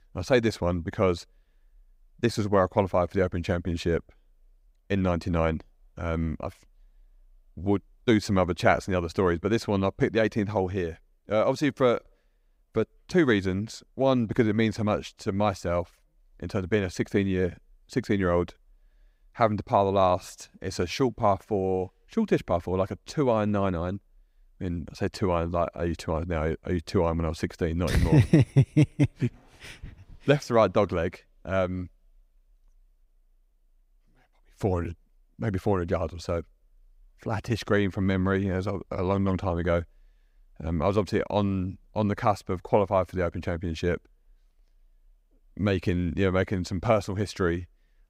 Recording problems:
none

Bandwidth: 15.5 kHz